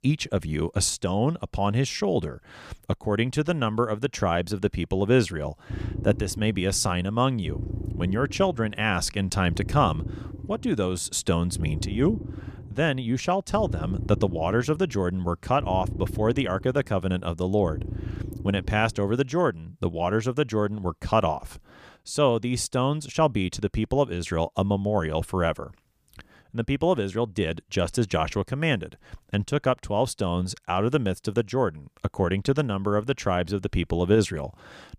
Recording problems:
low rumble; noticeable; from 5.5 to 19 s; 15 dB below the speech

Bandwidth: 15 kHz